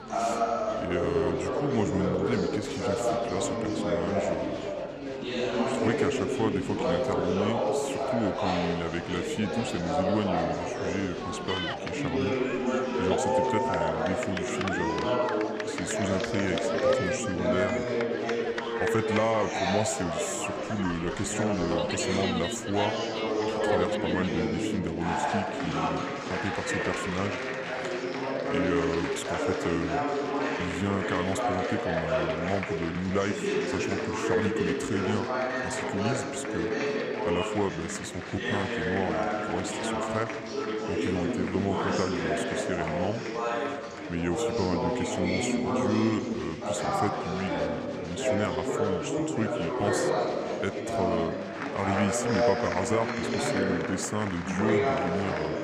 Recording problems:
murmuring crowd; very loud; throughout; 3 dB above the speech

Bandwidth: 15 kHz